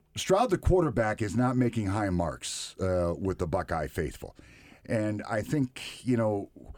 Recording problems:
none

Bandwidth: 18.5 kHz